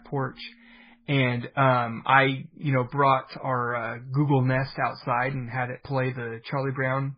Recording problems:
garbled, watery; badly; nothing above 5 kHz

